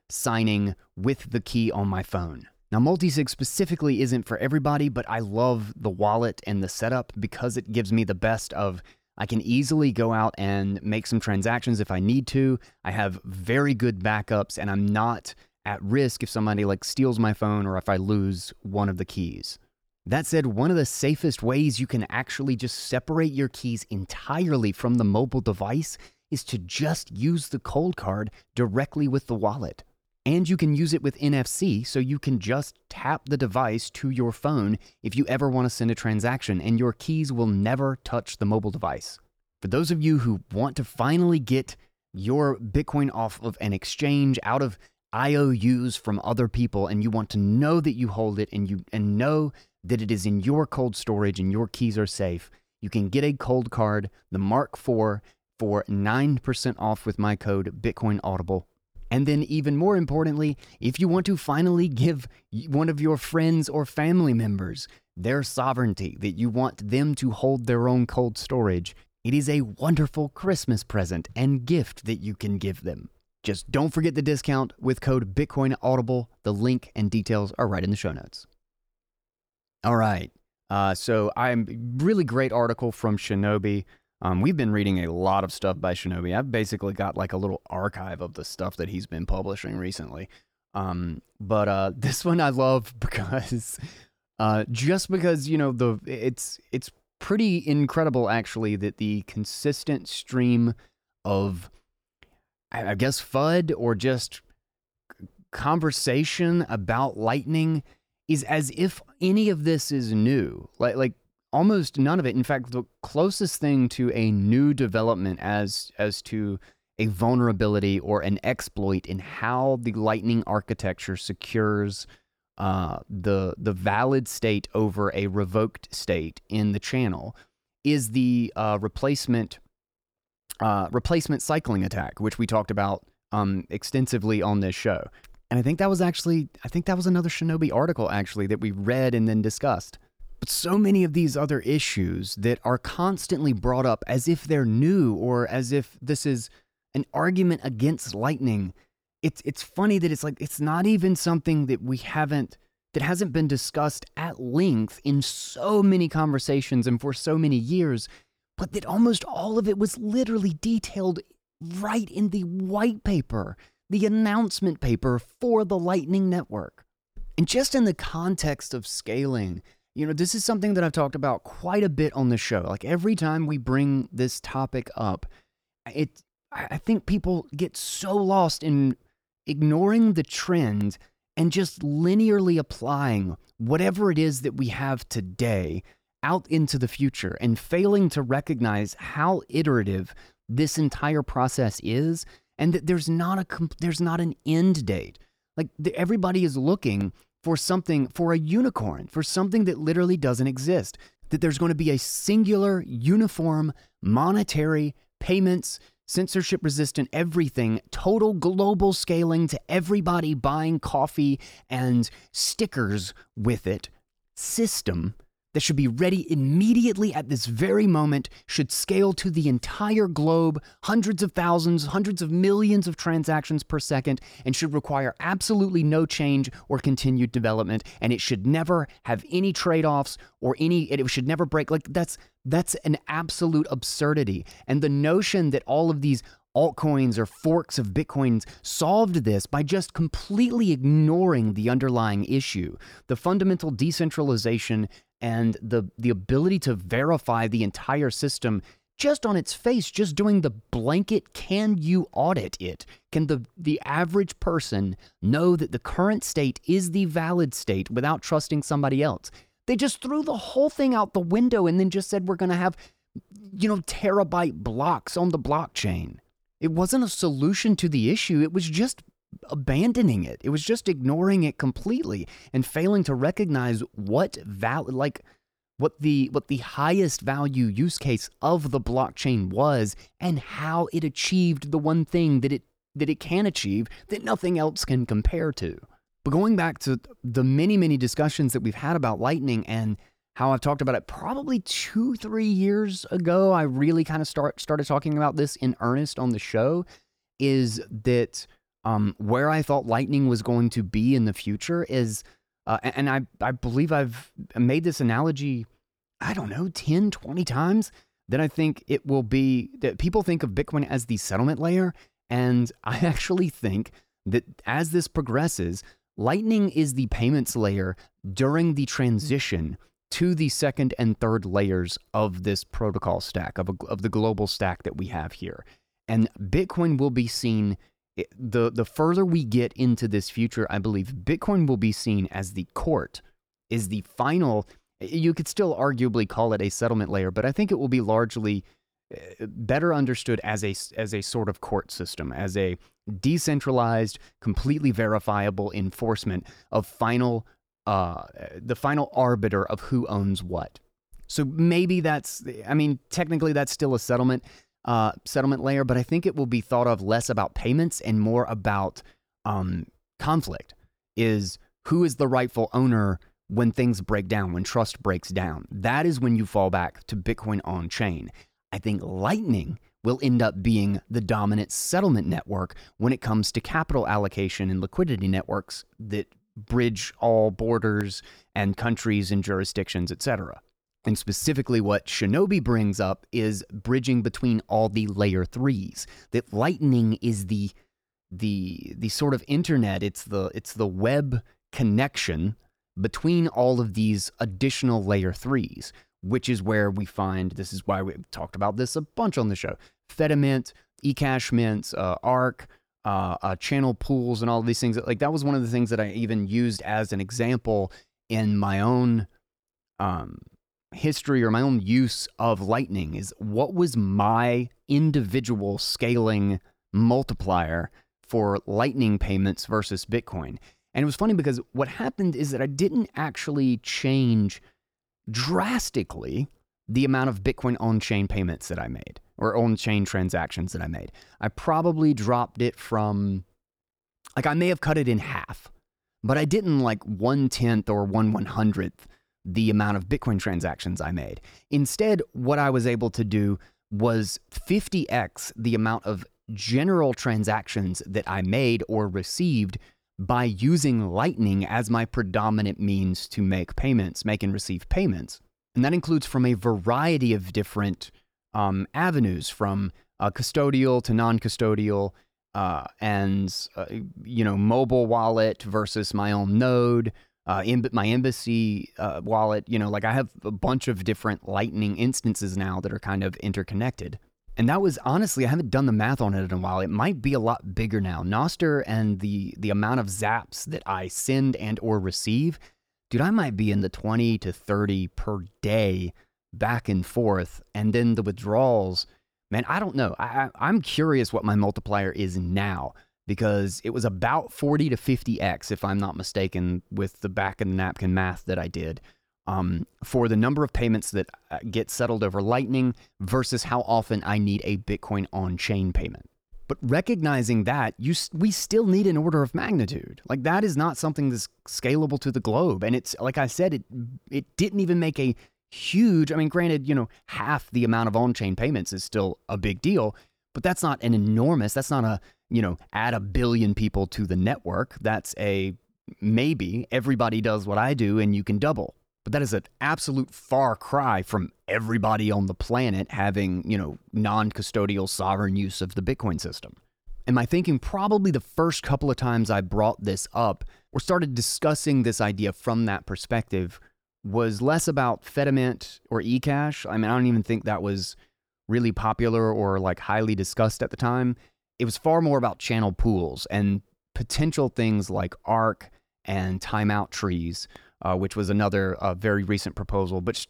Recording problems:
none

